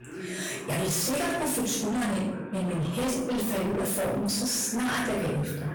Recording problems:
distortion; heavy; 35% of the sound clipped
off-mic speech; far
room echo; noticeable; dies away in 0.6 s
voice in the background; noticeable; throughout; 10 dB below the speech

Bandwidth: 18.5 kHz